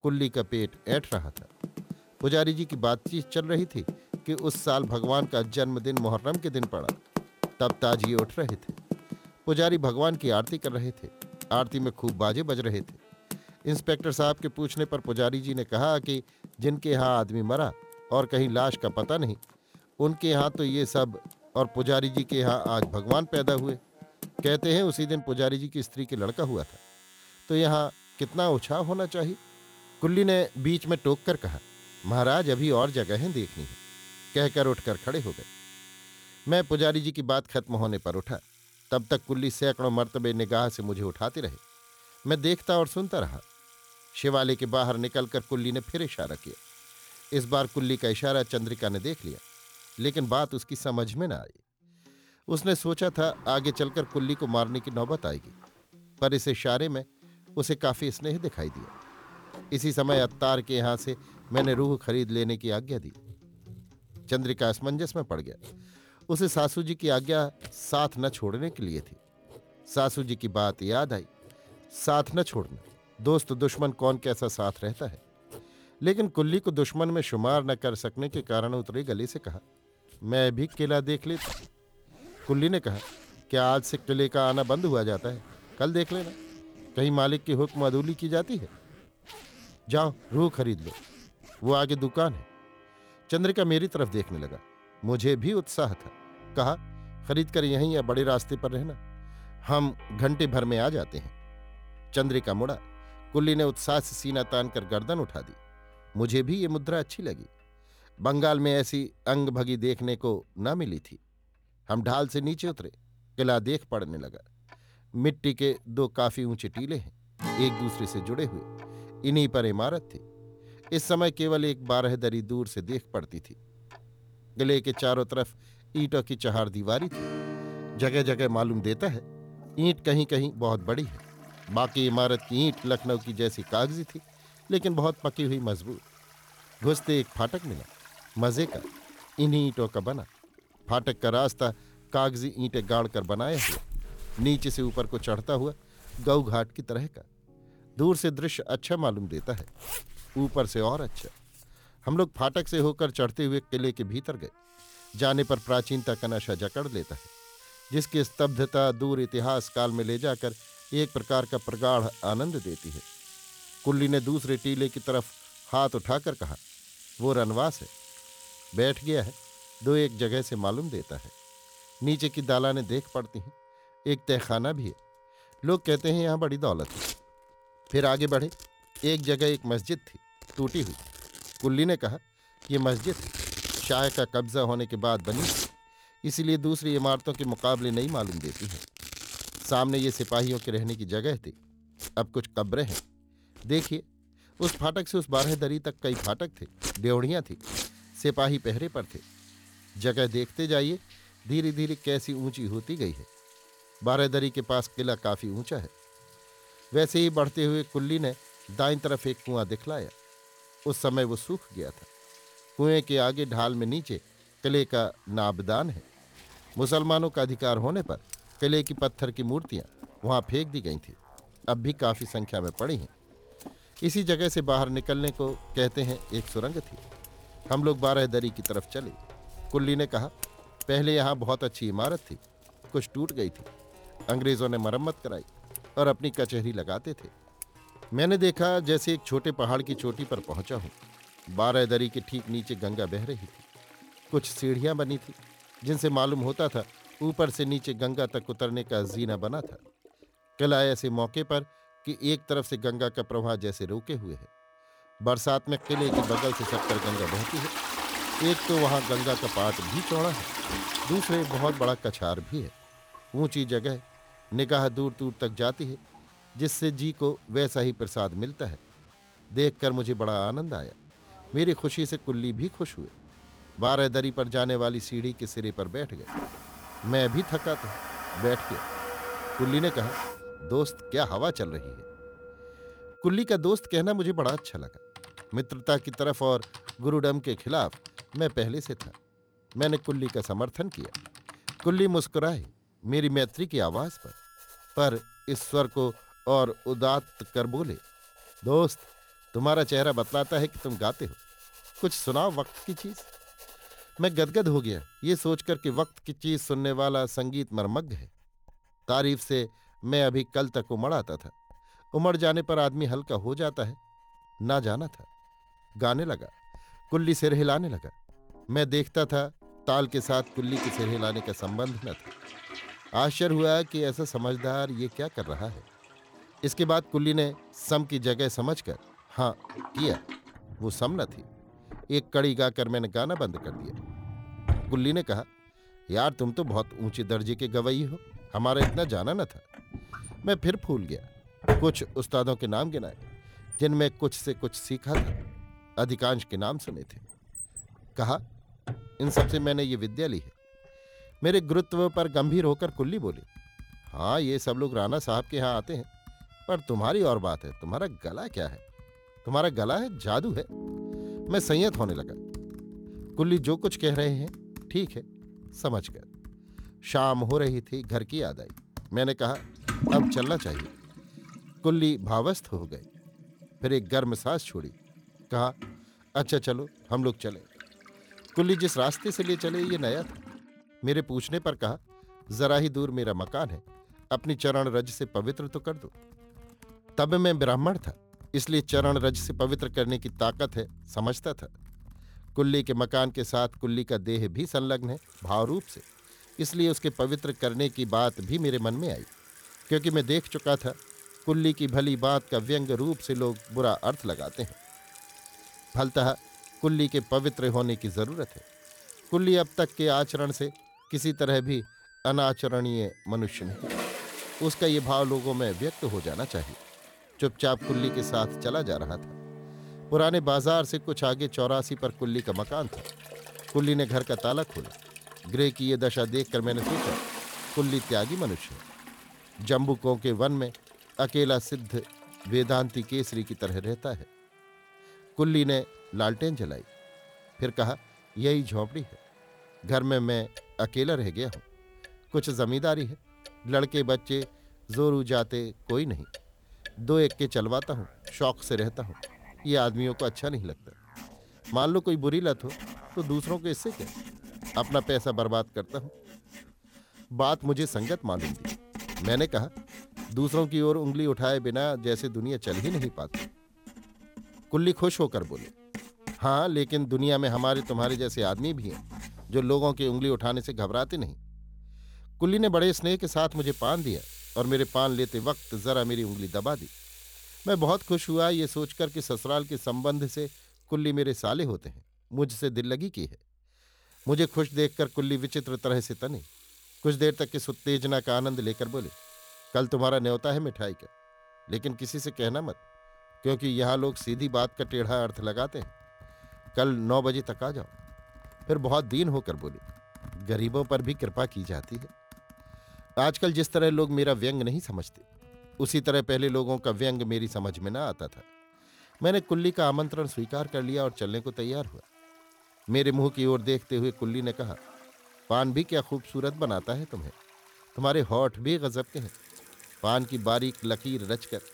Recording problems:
household noises; noticeable; throughout; 15 dB below the speech
background music; faint; throughout; 25 dB below the speech

